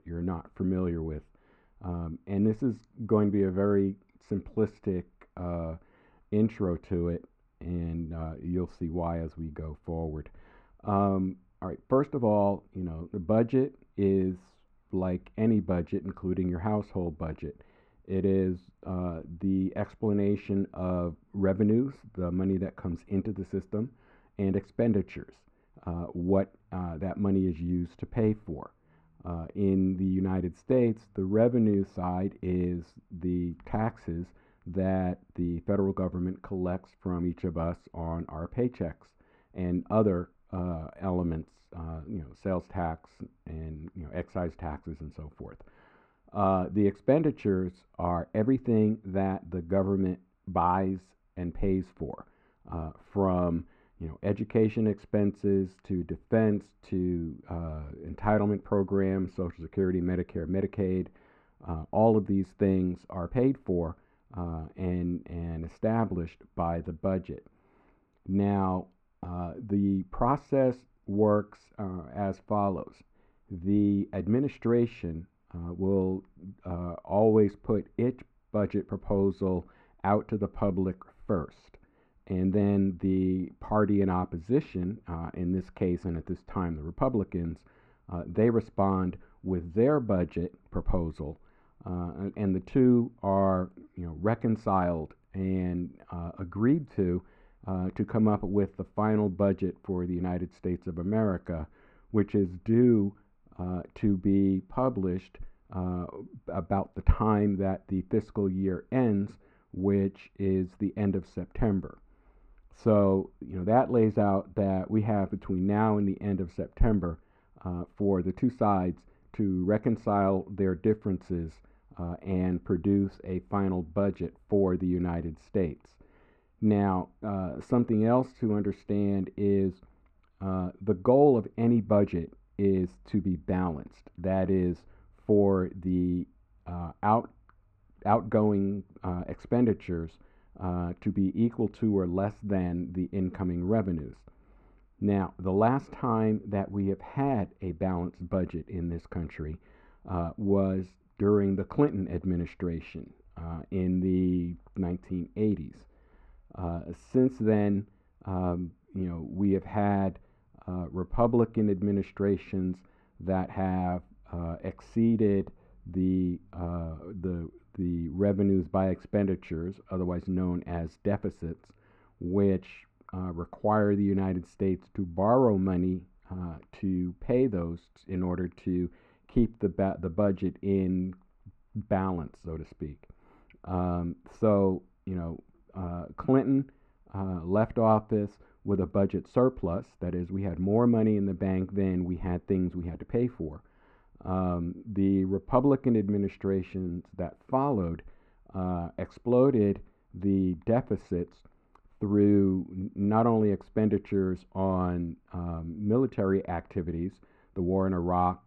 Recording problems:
muffled; very; fading above 1.5 kHz

